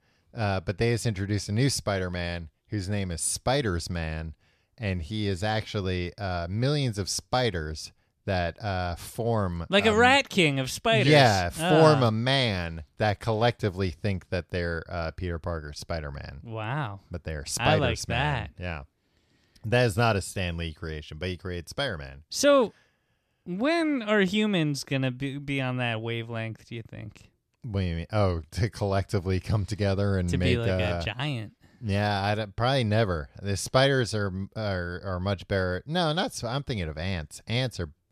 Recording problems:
none

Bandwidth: 14 kHz